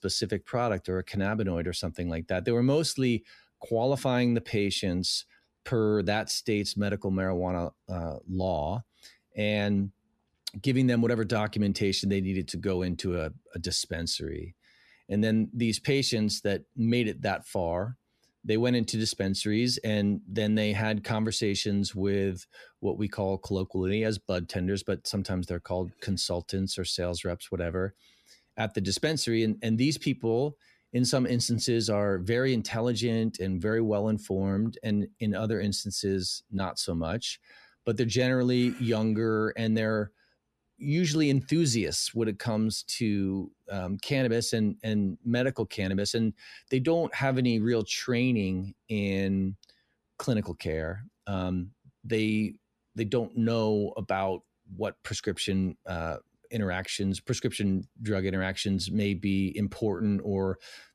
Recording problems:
none

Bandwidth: 14.5 kHz